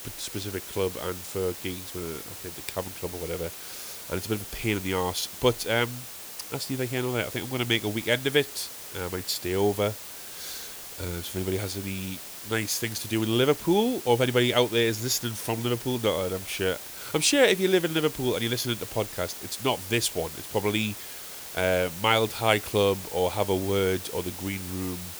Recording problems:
hiss; noticeable; throughout; 10 dB below the speech

